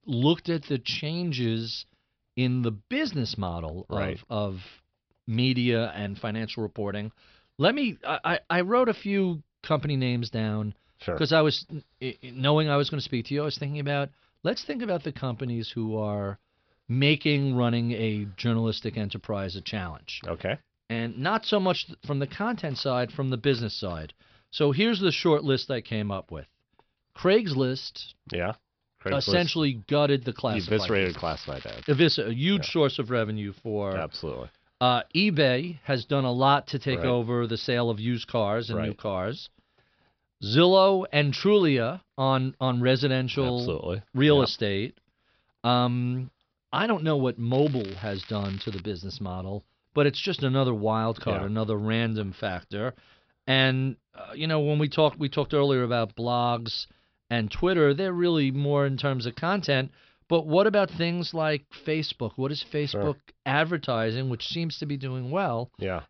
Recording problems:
high frequencies cut off; noticeable; nothing above 5.5 kHz
crackling; noticeable; from 30 to 32 s and from 48 to 49 s; 20 dB below the speech

